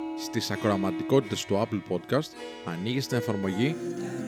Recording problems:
background music; loud; throughout; 8 dB below the speech

